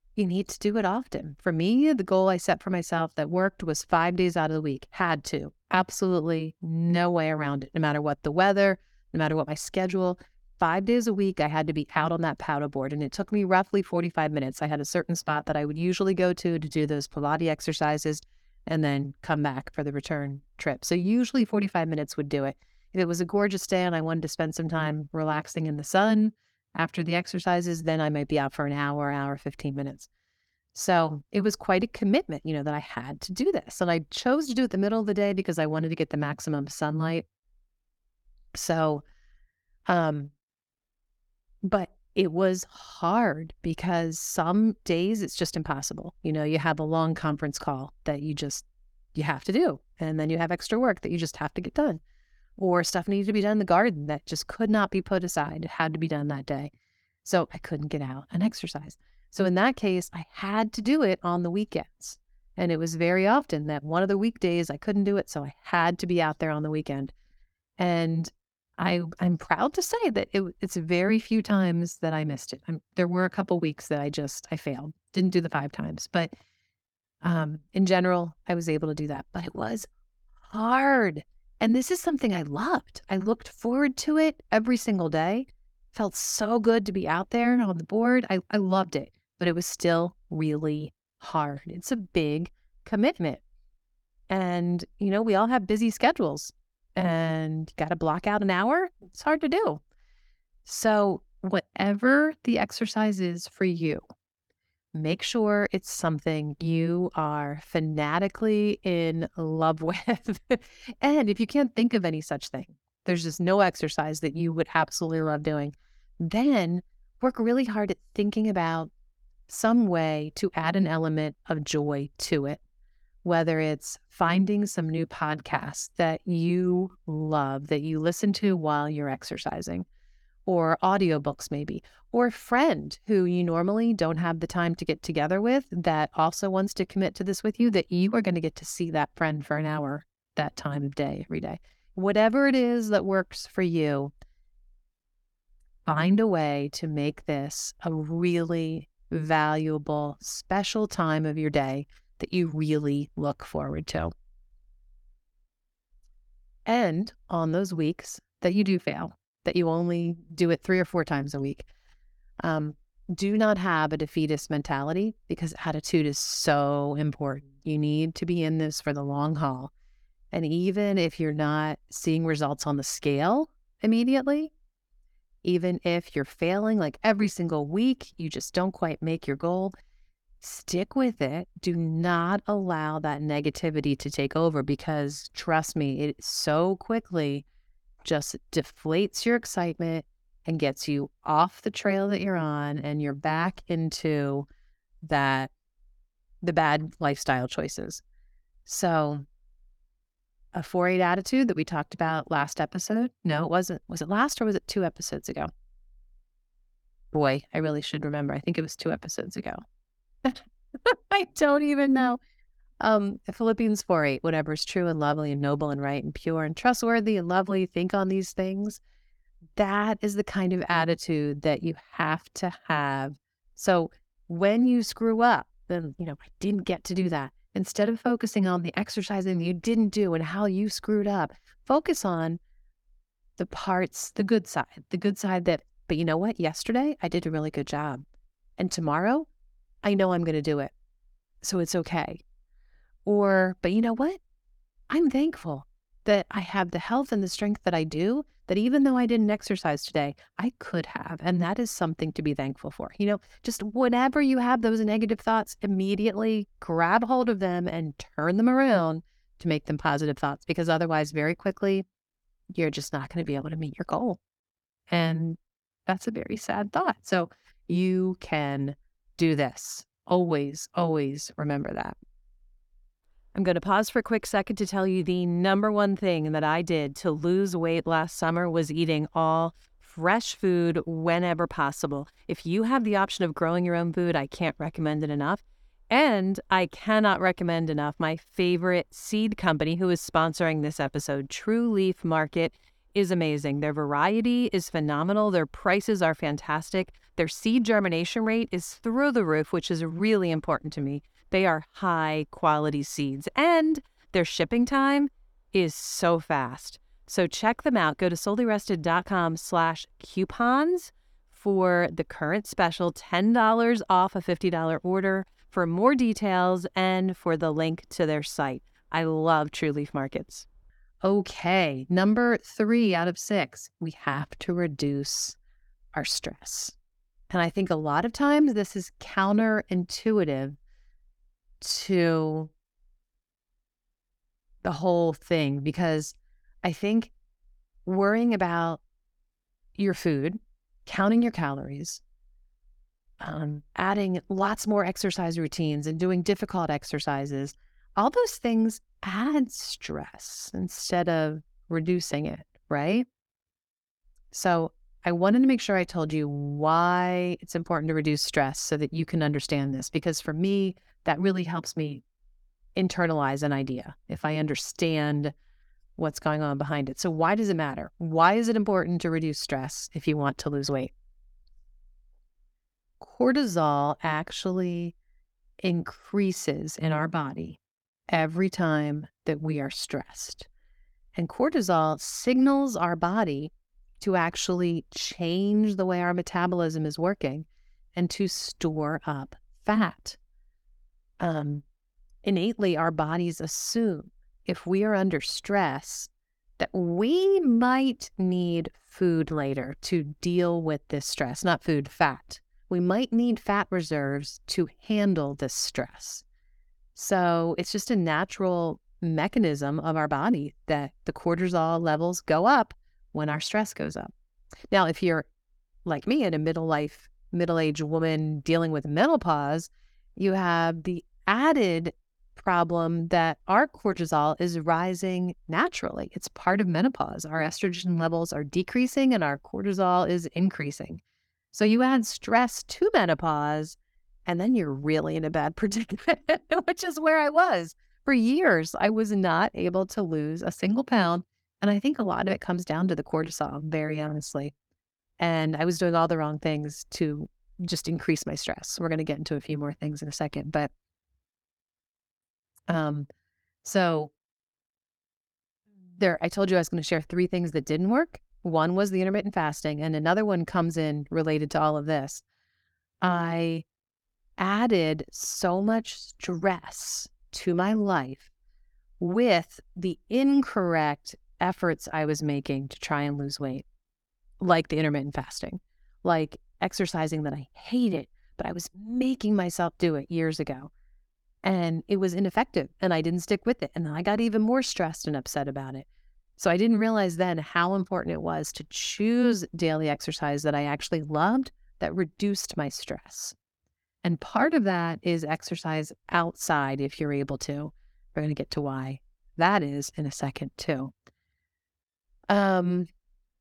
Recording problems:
none

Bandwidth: 17.5 kHz